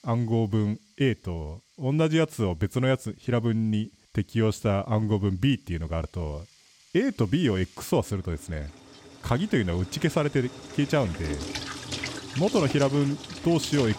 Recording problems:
household noises; noticeable; throughout; 10 dB below the speech

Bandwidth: 16.5 kHz